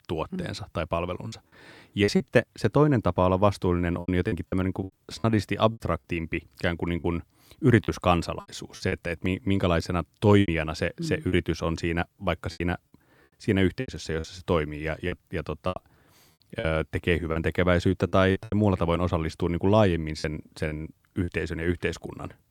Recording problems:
choppy; very; 9% of the speech affected

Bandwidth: 18.5 kHz